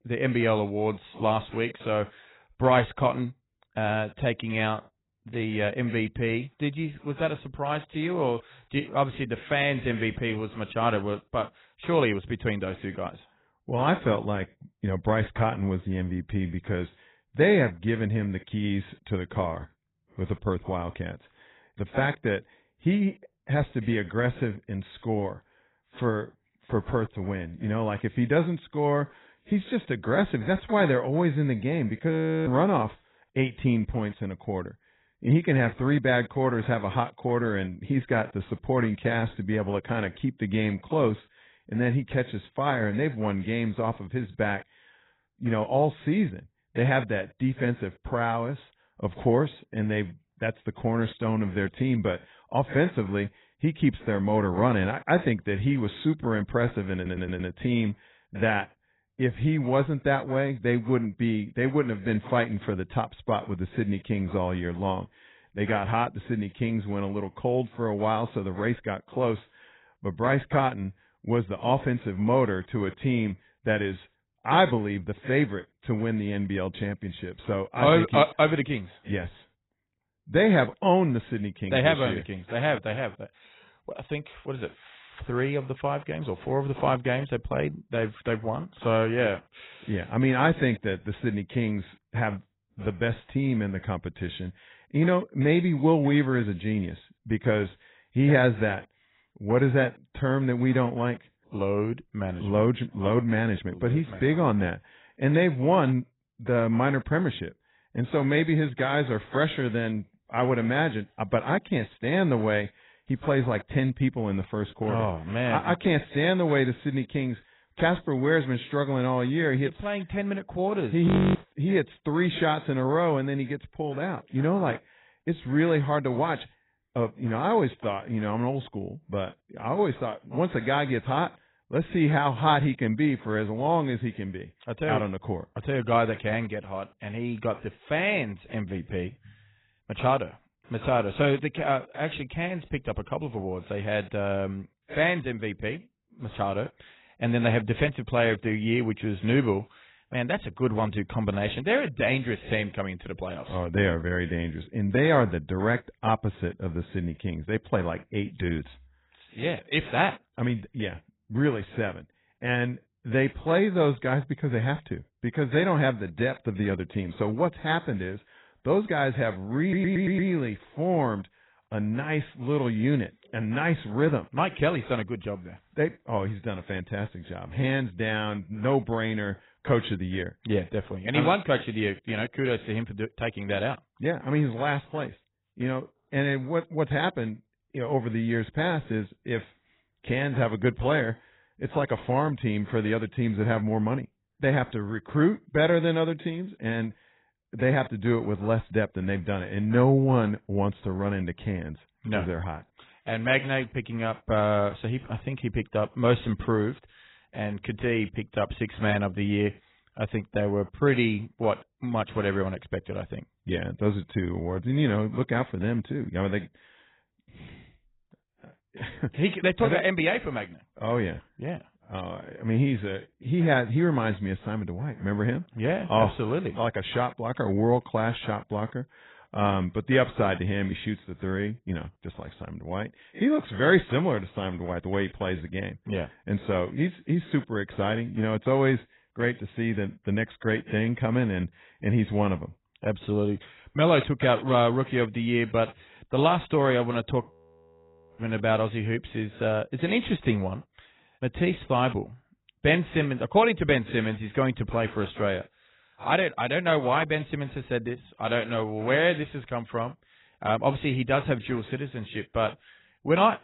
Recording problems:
garbled, watery; badly; nothing above 4 kHz
audio freezing; at 32 s, at 2:01 and at 4:07 for 1 s
audio stuttering; at 57 s and at 2:50

